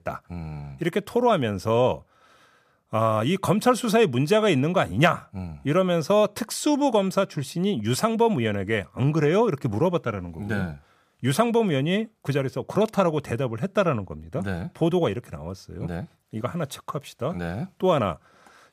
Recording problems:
none

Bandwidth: 14.5 kHz